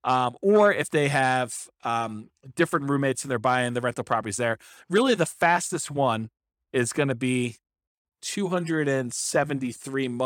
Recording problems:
abrupt cut into speech; at the end

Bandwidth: 17 kHz